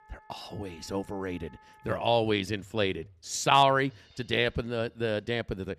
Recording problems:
background music; faint; throughout; 30 dB below the speech

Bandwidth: 14.5 kHz